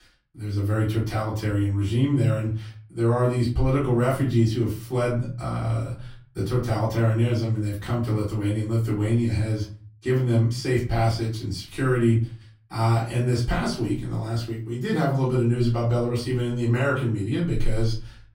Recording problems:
off-mic speech; far
room echo; slight; dies away in 0.4 s

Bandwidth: 16 kHz